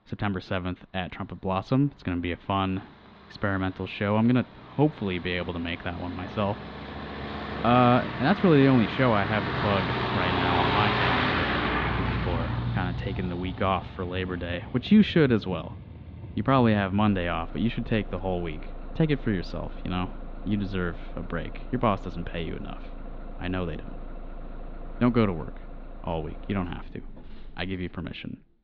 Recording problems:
muffled; slightly; fading above 4 kHz
traffic noise; loud; throughout; 6 dB below the speech

